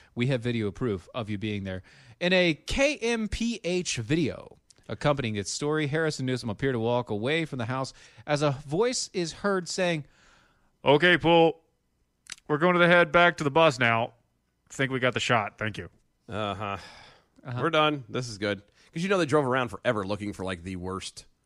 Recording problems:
none

